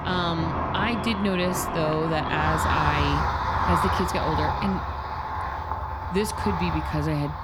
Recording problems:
traffic noise; very loud; throughout; as loud as the speech

